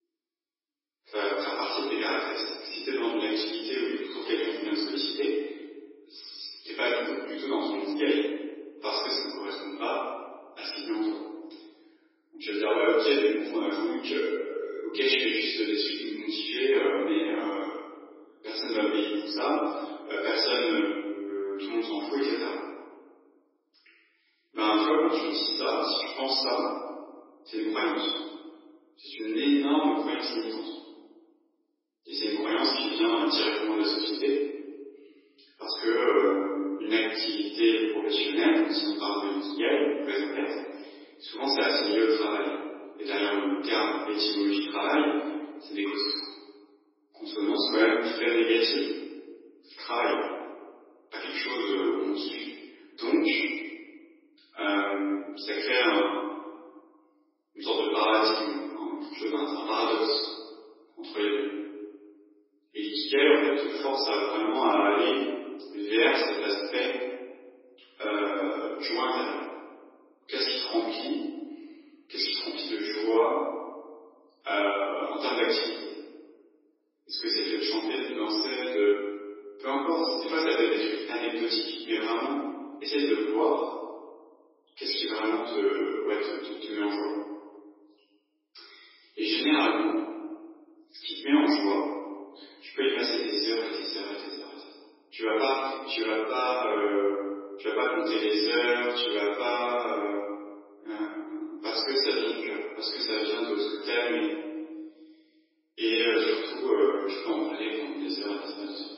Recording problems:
room echo; strong; dies away in 1.4 s
off-mic speech; far
garbled, watery; badly; nothing above 5.5 kHz
thin; somewhat; fading below 300 Hz

